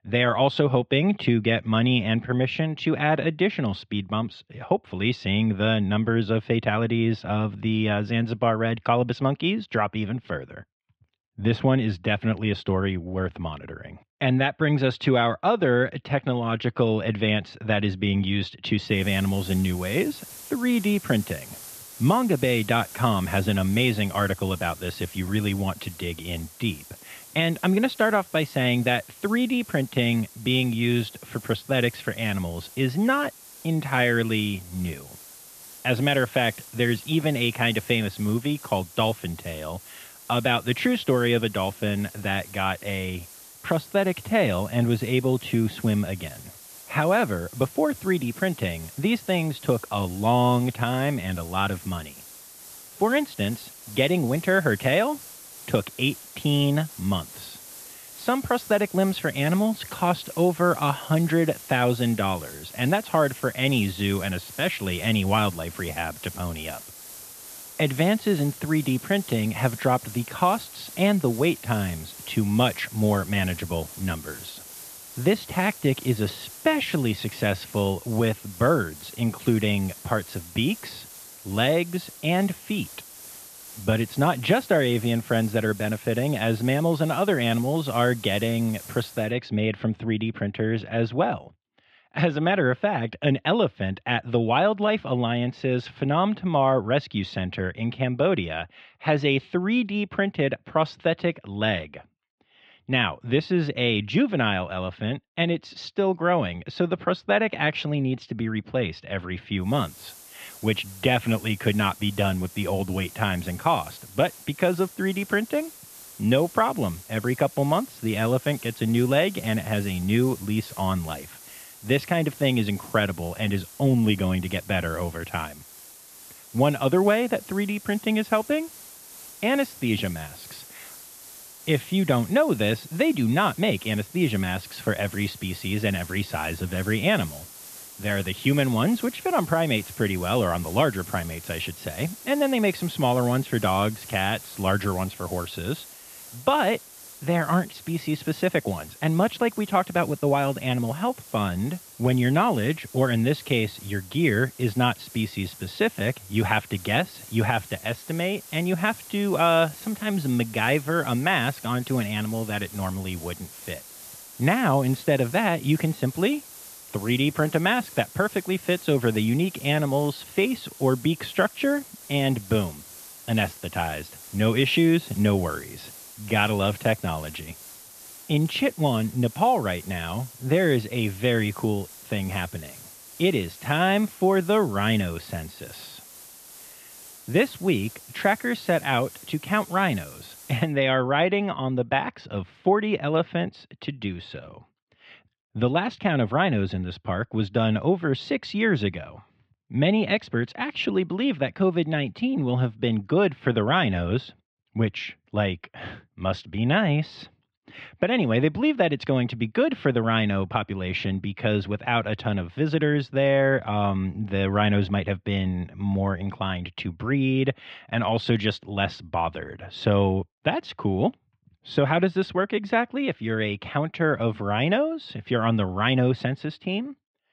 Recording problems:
muffled; very; fading above 3 kHz
hiss; noticeable; from 19 s to 1:29 and from 1:50 to 3:11; 15 dB below the speech

